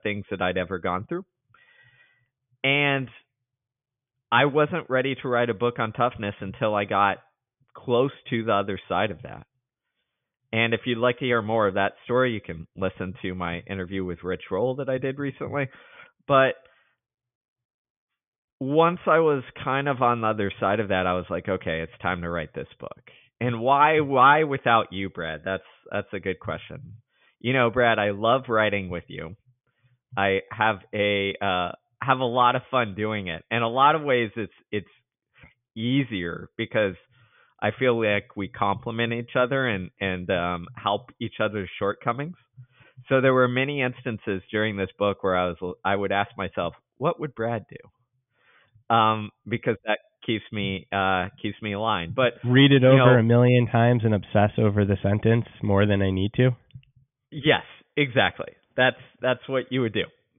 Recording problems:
high frequencies cut off; severe; nothing above 3.5 kHz

